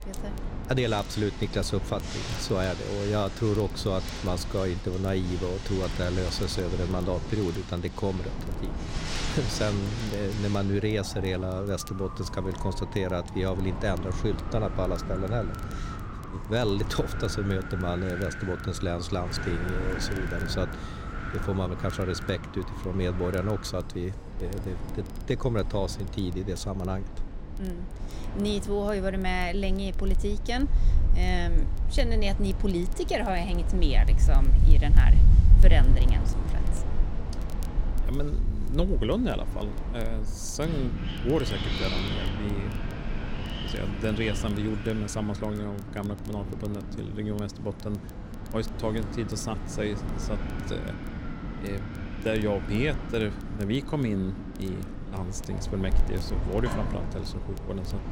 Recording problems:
wind in the background; loud; throughout; 1 dB below the speech
crackle, like an old record; faint; 25 dB below the speech

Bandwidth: 16 kHz